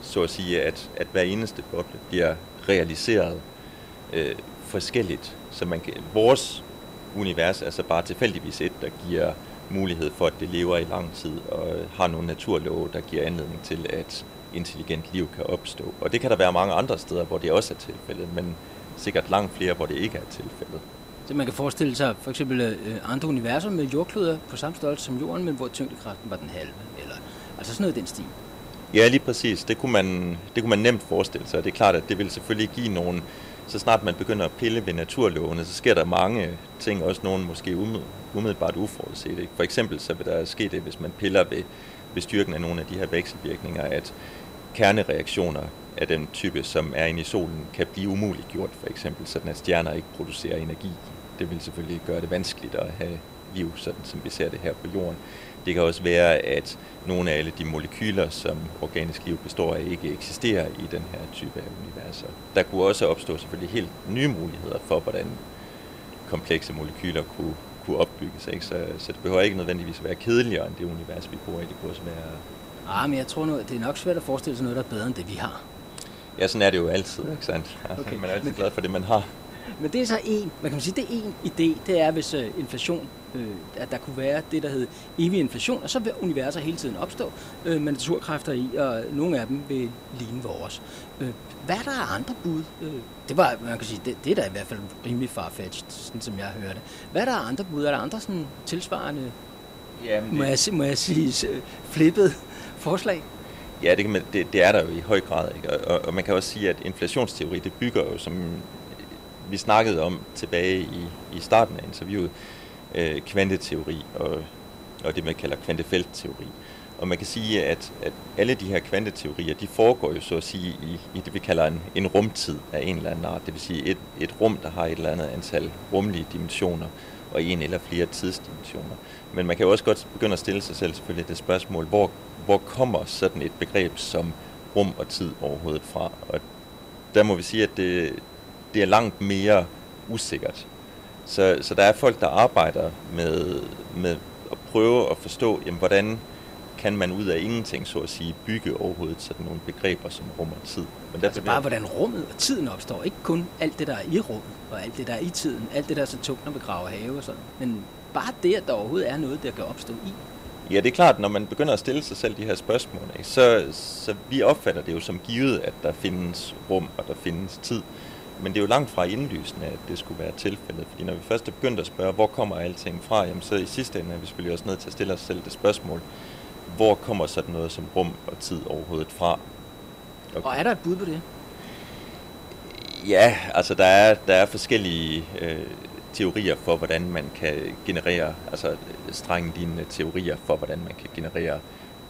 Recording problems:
hiss; noticeable; throughout; 15 dB below the speech
high-pitched whine; faint; throughout; 4 kHz, 25 dB below the speech

